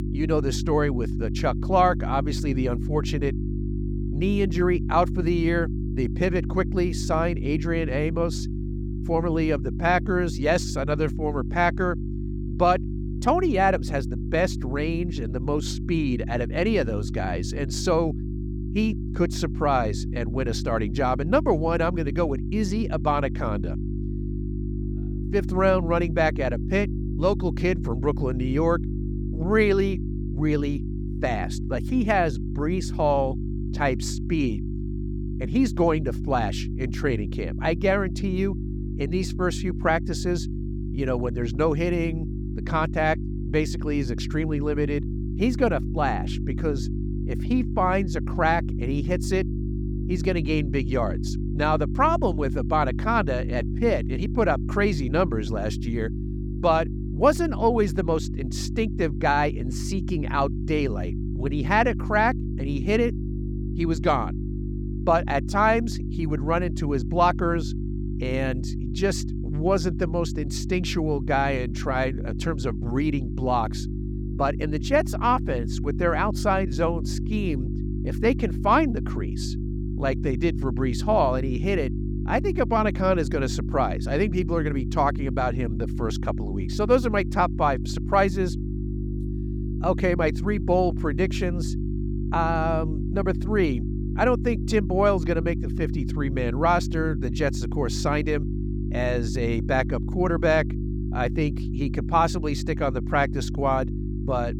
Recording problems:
electrical hum; noticeable; throughout; 50 Hz, 15 dB below the speech

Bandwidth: 18 kHz